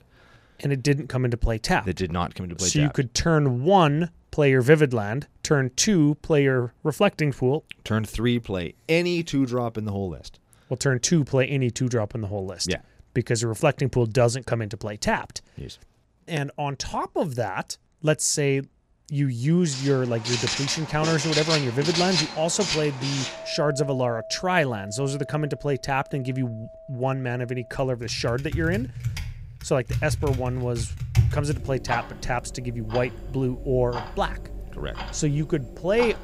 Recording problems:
household noises; loud; from 20 s on; 6 dB below the speech

